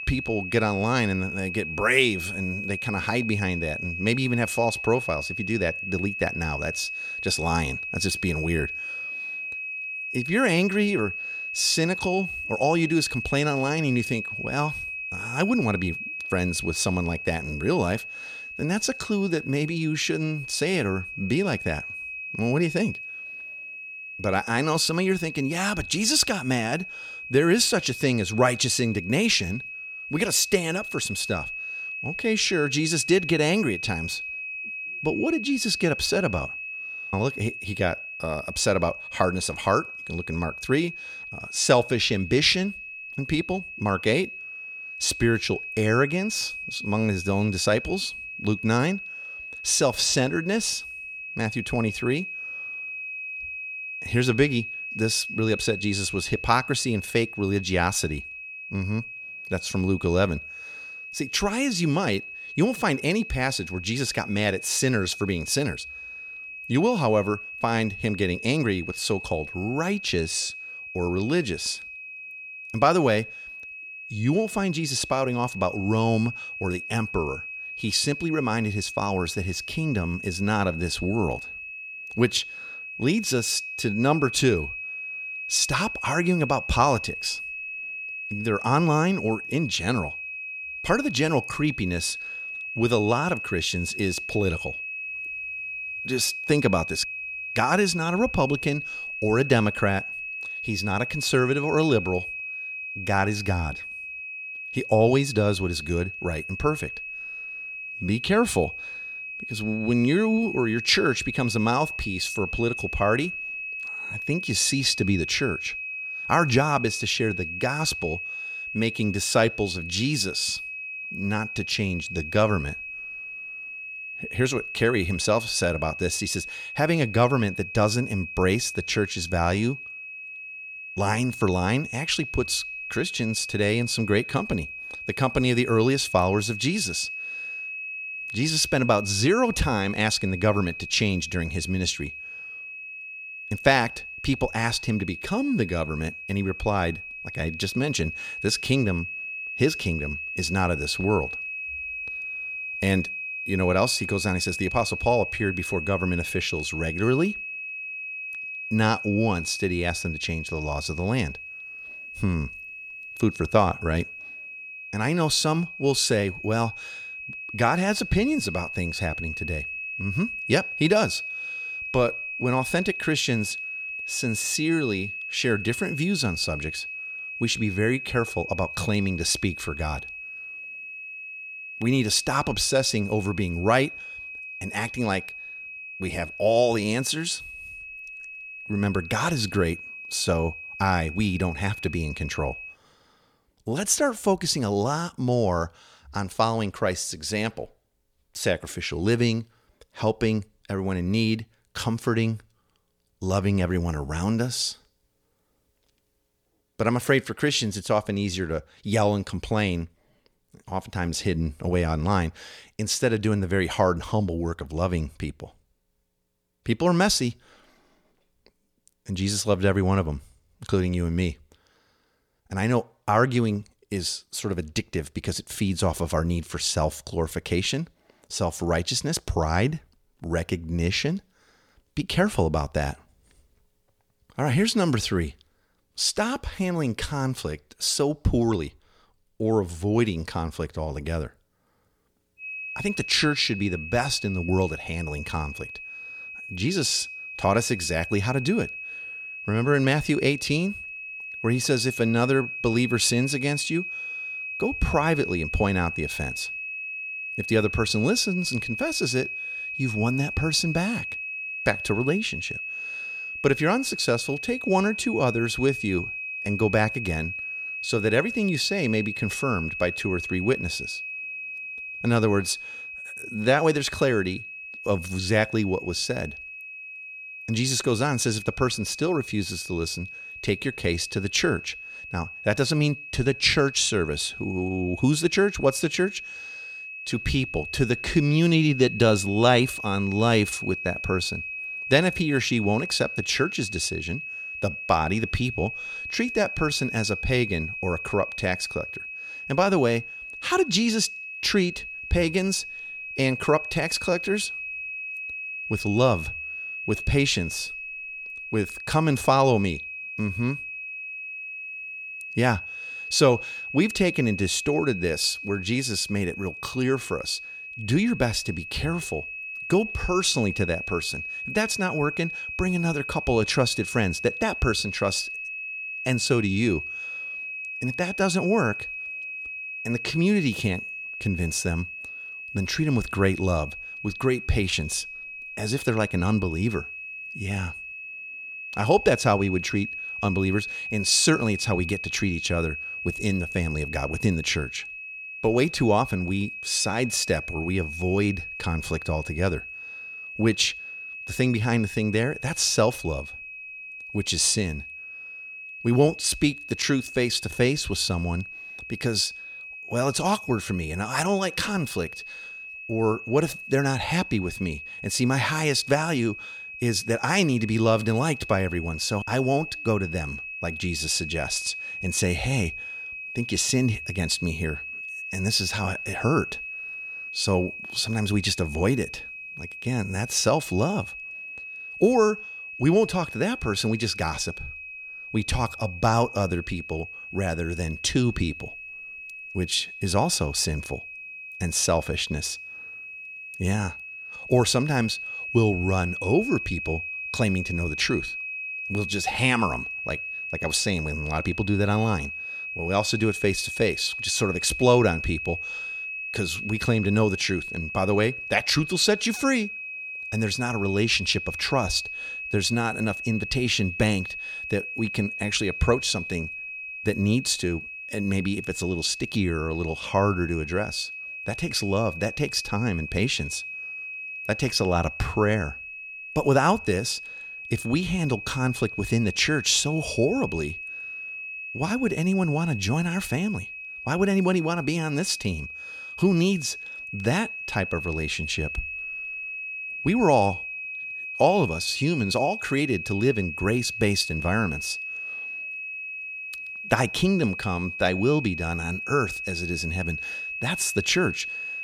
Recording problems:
high-pitched whine; loud; until 3:13 and from 4:02 on; 2.5 kHz, 8 dB below the speech

